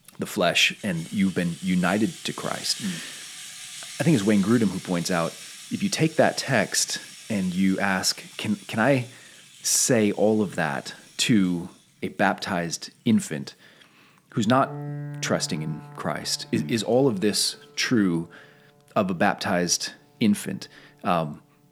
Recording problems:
background music; noticeable; throughout; 15 dB below the speech

